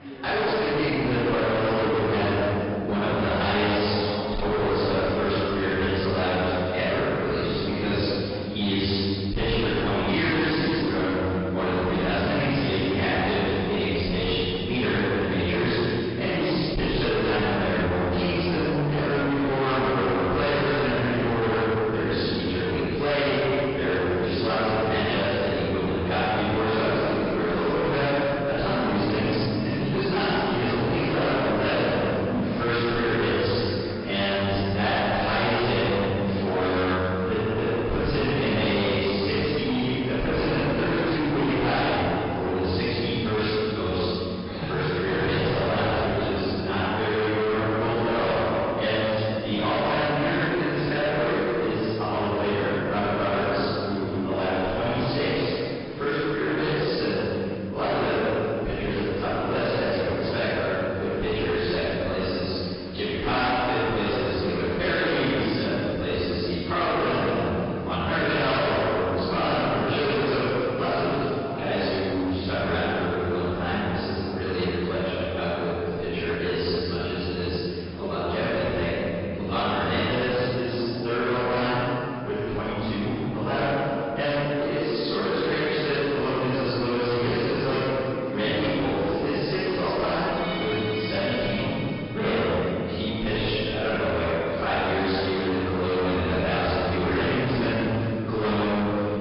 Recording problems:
distortion; heavy; 32% of the sound clipped
room echo; strong; dies away in 2.4 s
off-mic speech; far
garbled, watery; badly
high frequencies cut off; noticeable; nothing above 5 kHz
chatter from many people; noticeable; throughout; 15 dB below the speech
background music; very faint; throughout; 20 dB below the speech

